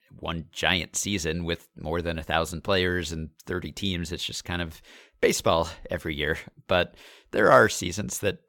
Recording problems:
none

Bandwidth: 17 kHz